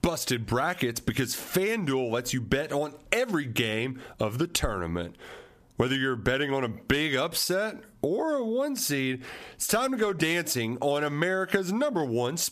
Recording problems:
squashed, flat; heavily

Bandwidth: 14.5 kHz